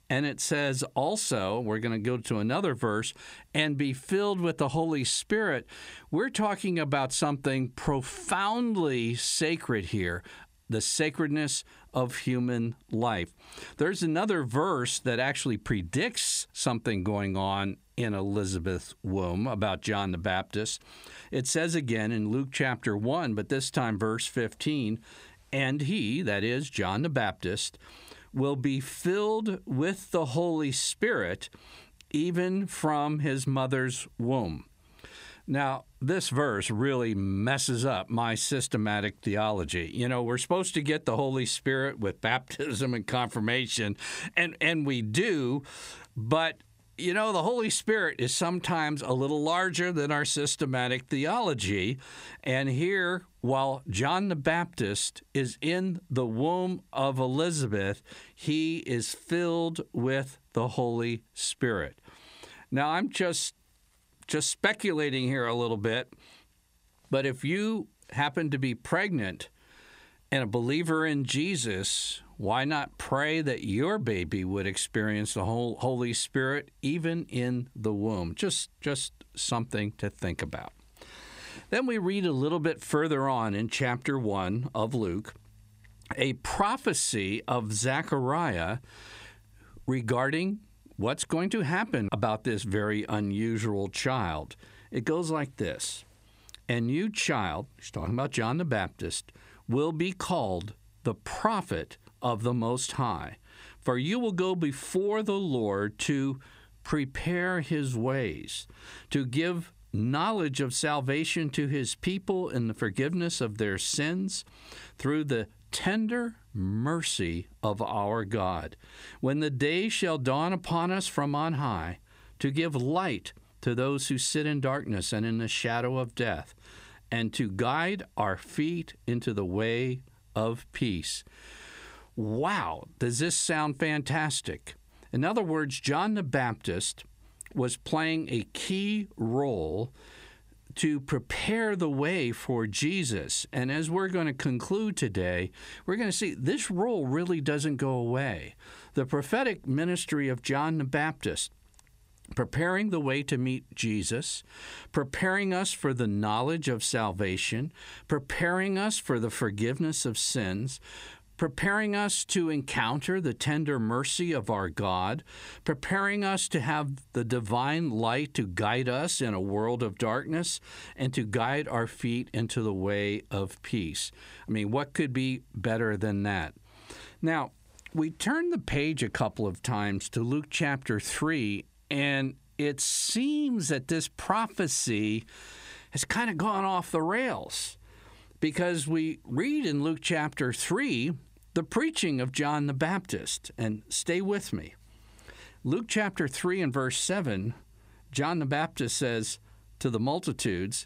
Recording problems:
squashed, flat; heavily

